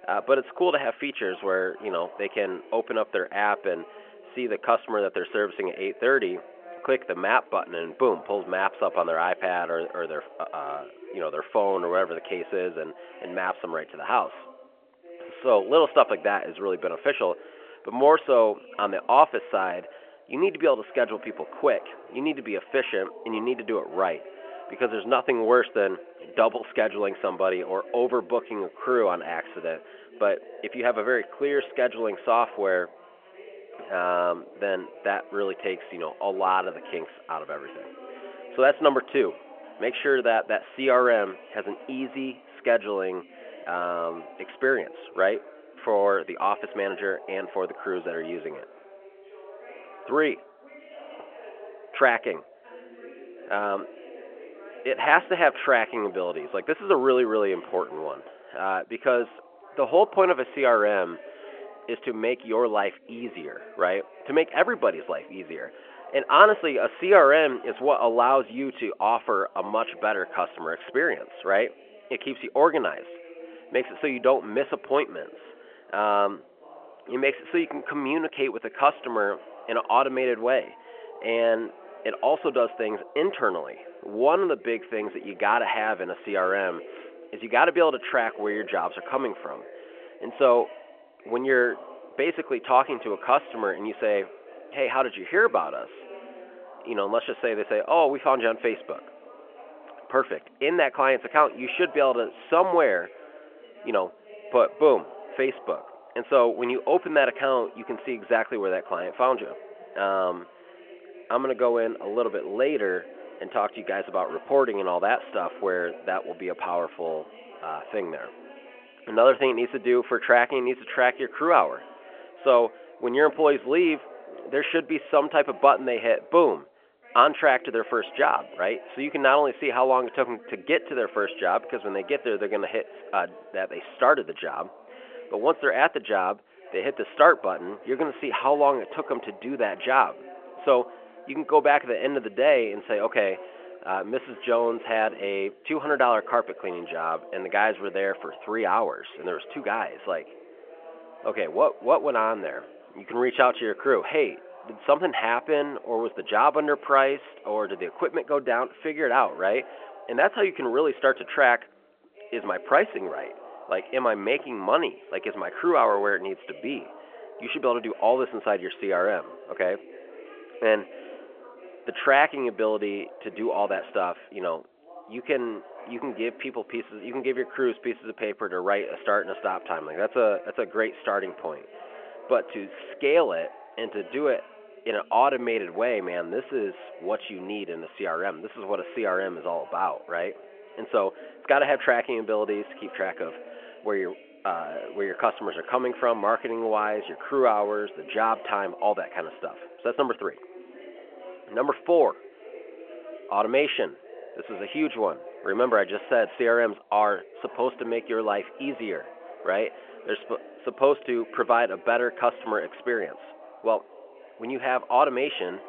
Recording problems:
phone-call audio
background chatter; faint; throughout; 2 voices, 20 dB below the speech

